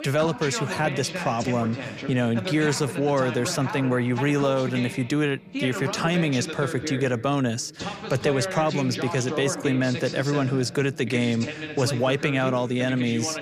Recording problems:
voice in the background; loud; throughout; 8 dB below the speech

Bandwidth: 15 kHz